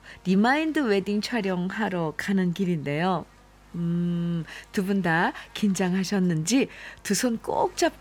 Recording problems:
electrical hum; faint; throughout; 50 Hz, 25 dB below the speech

